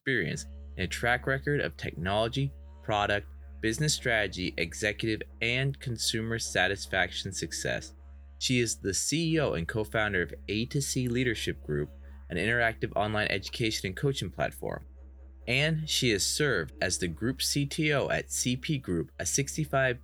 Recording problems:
background music; faint; throughout; 20 dB below the speech

